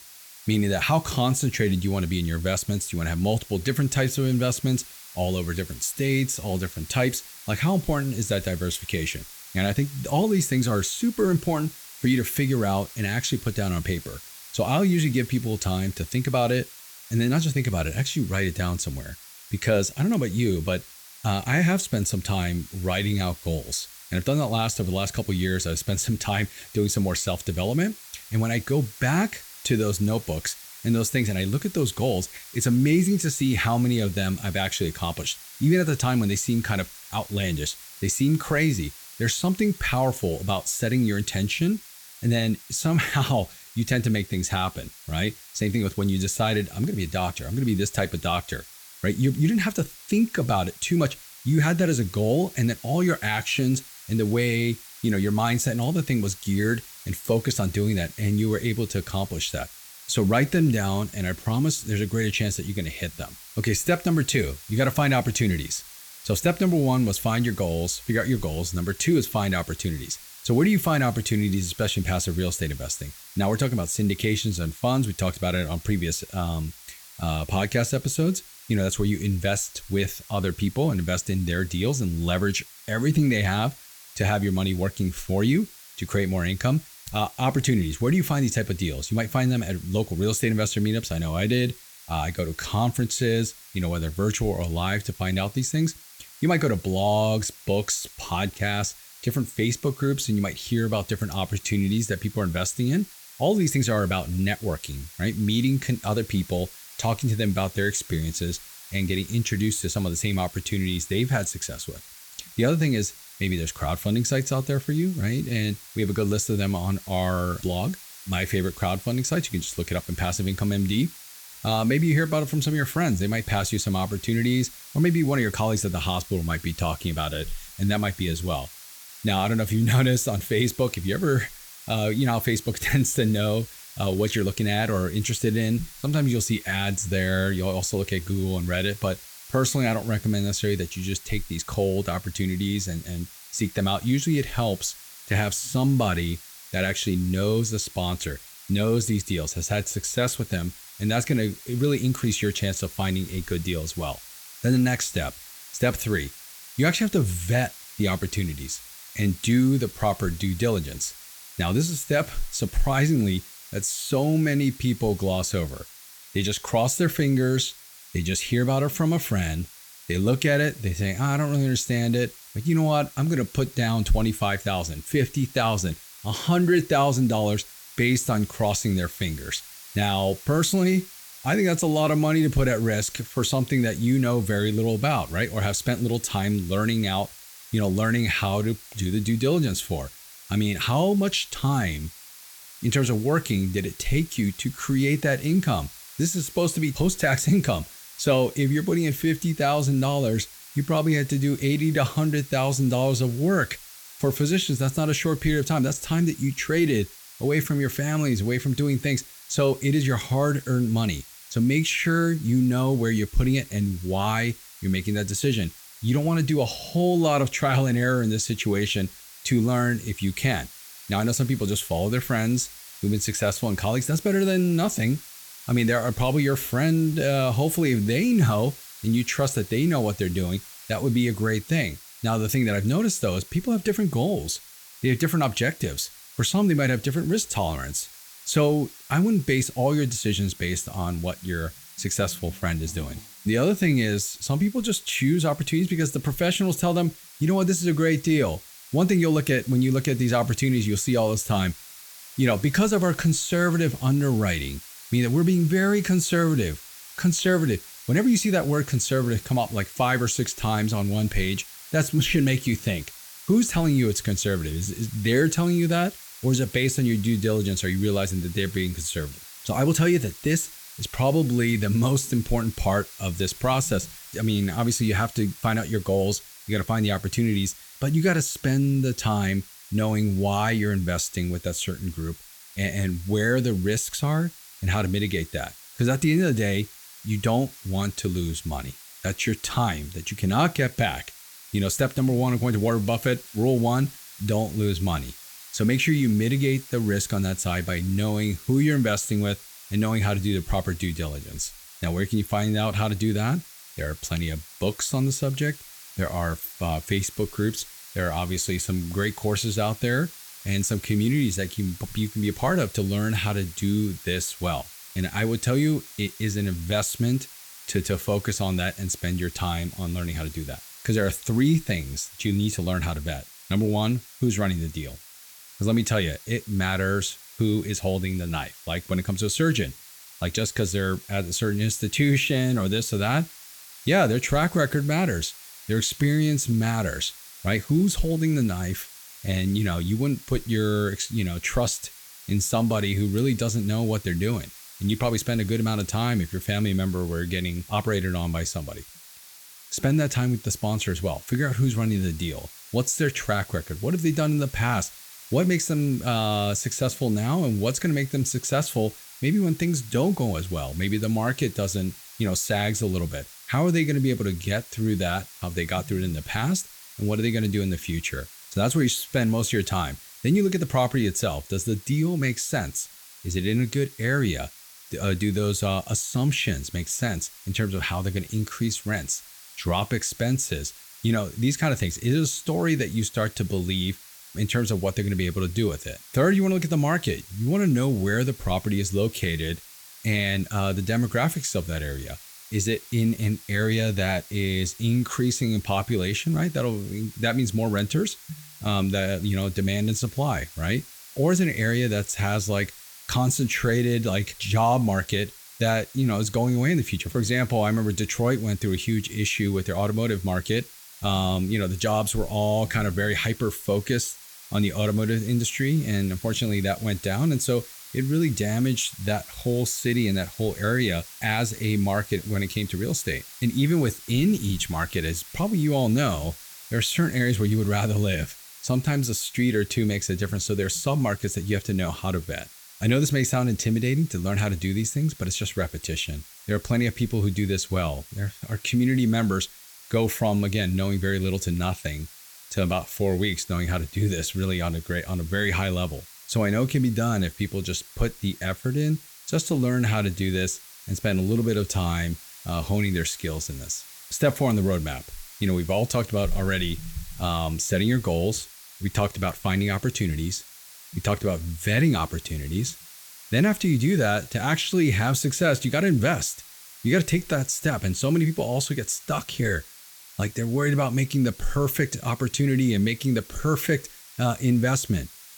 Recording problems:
hiss; noticeable; throughout; 15 dB below the speech

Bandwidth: 18.5 kHz